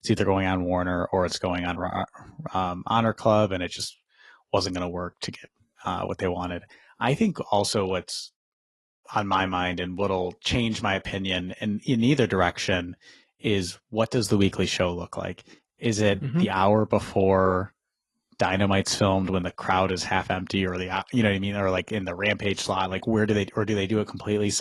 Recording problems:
garbled, watery; slightly; nothing above 11.5 kHz
abrupt cut into speech; at the end

